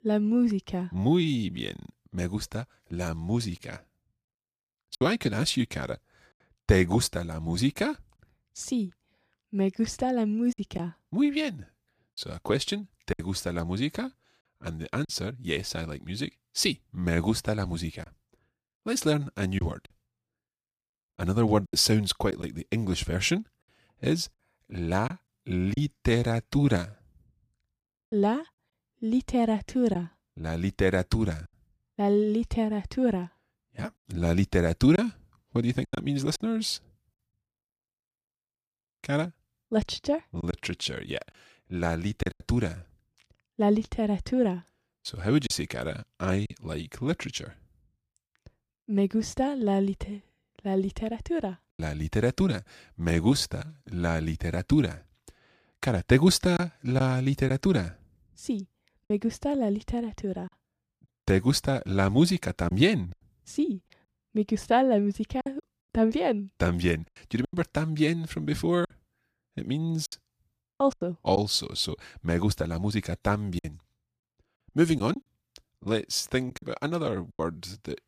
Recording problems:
choppy; occasionally; 4% of the speech affected

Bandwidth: 15 kHz